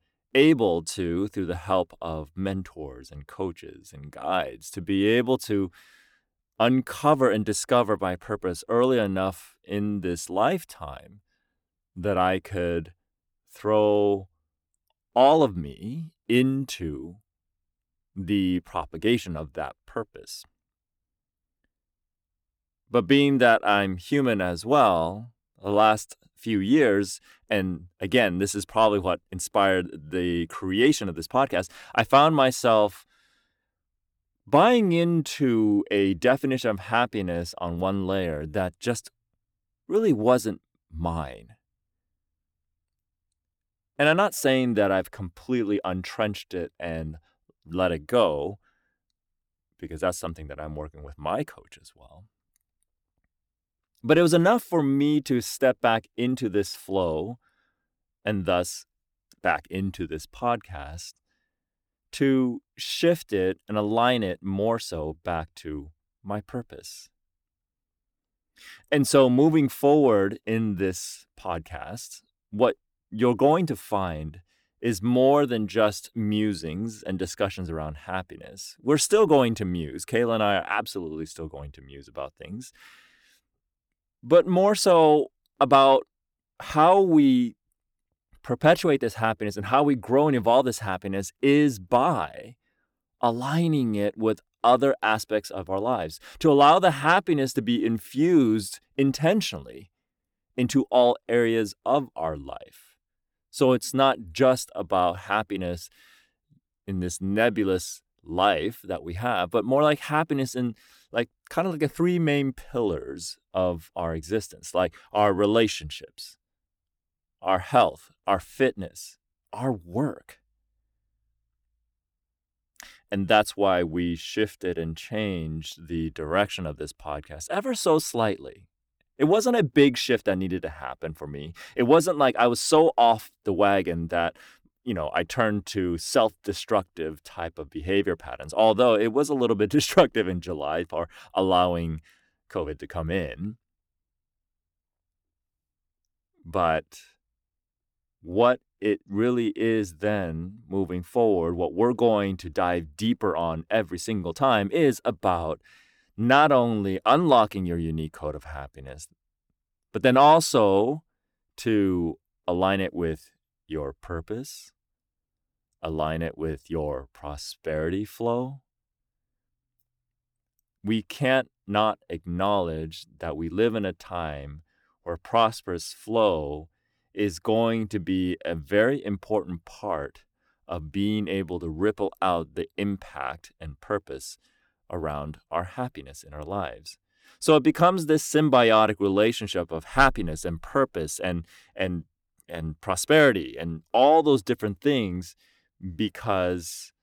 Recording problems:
none

